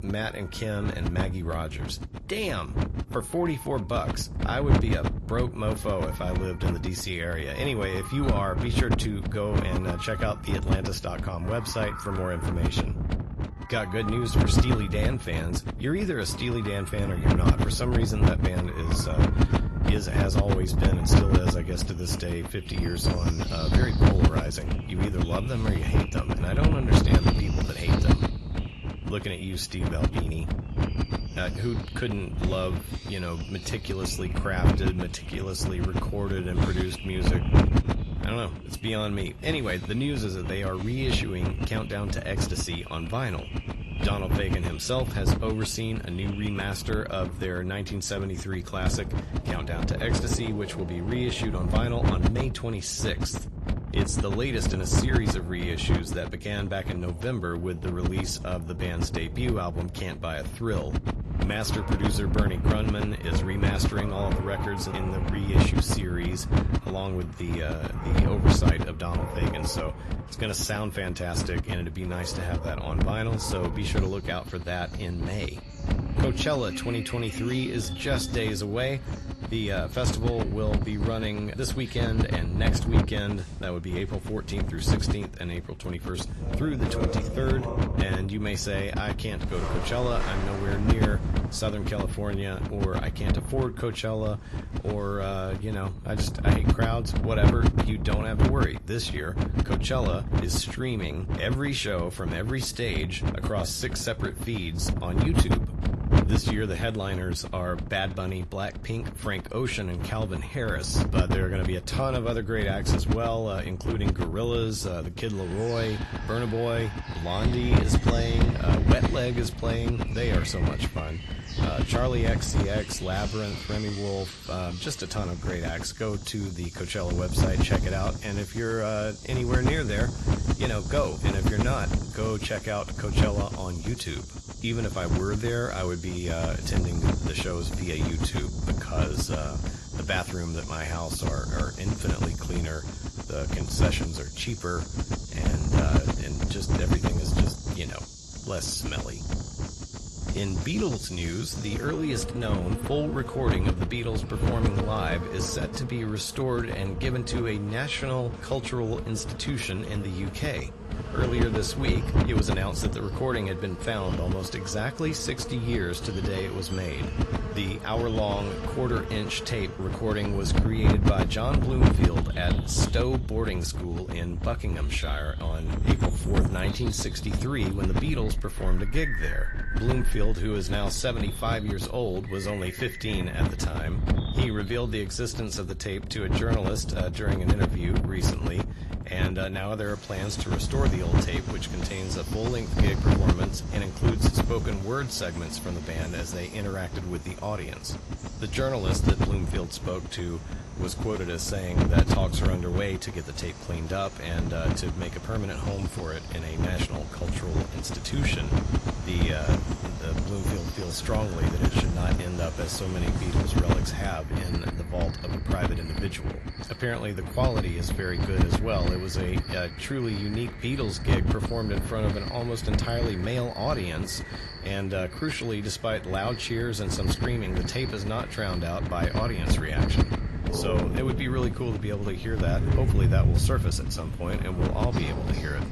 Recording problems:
garbled, watery; slightly; nothing above 12 kHz
wind noise on the microphone; heavy; 4 dB below the speech
animal sounds; loud; throughout; 9 dB below the speech

